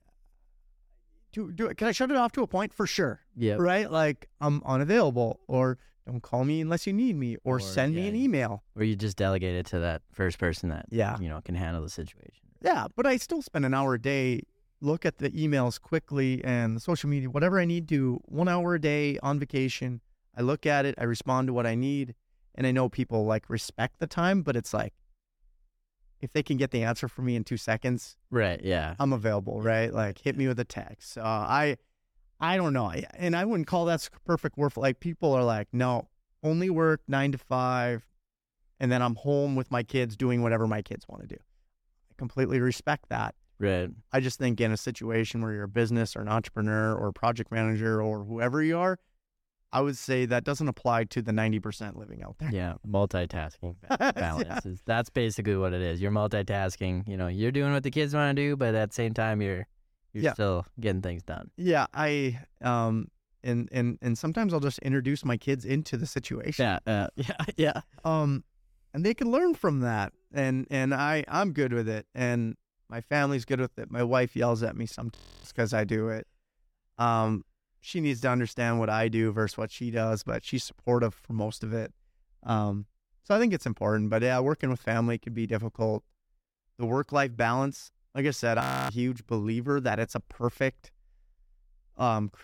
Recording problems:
audio freezing; at 1:15 and at 1:29

